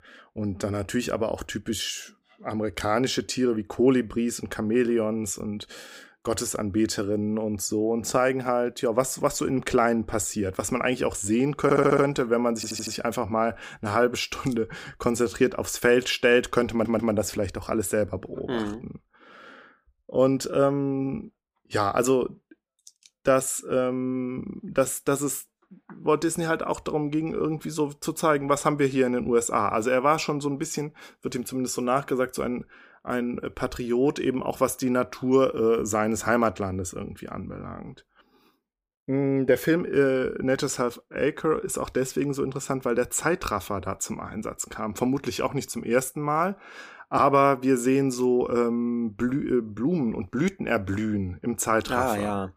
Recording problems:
audio stuttering; at 12 s, at 13 s and at 17 s

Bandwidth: 15 kHz